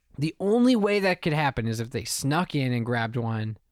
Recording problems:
none

